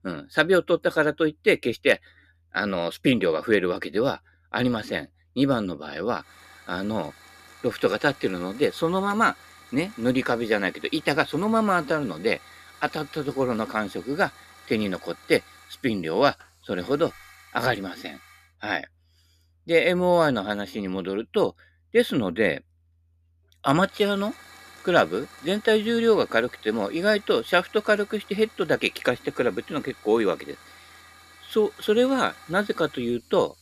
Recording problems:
hiss; faint; from 6.5 to 18 s and from 24 s on; 25 dB below the speech

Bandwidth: 14.5 kHz